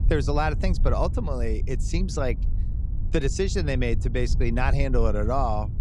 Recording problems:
low rumble; noticeable; throughout; 15 dB below the speech

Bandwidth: 14.5 kHz